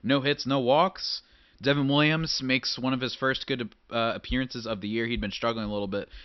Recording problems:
high frequencies cut off; noticeable; nothing above 5.5 kHz

